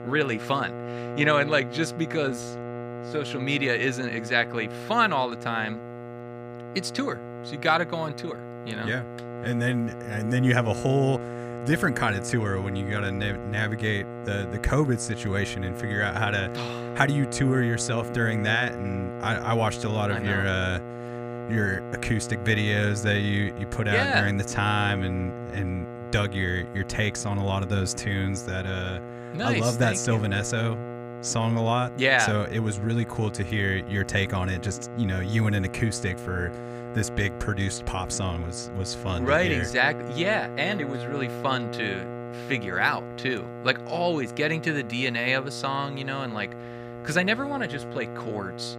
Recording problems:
electrical hum; noticeable; throughout; 60 Hz, 10 dB below the speech

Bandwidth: 15 kHz